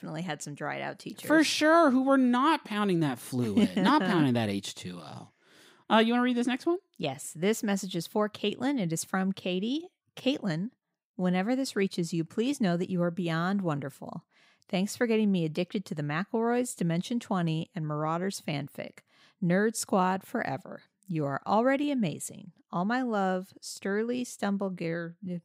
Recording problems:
none

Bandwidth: 15.5 kHz